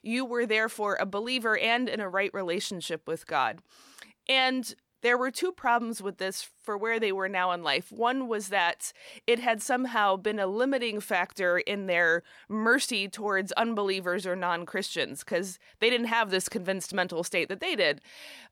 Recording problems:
none

